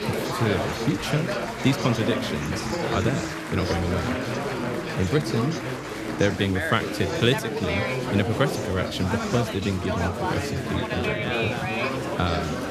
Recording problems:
chatter from many people; loud; throughout; 1 dB below the speech

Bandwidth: 14.5 kHz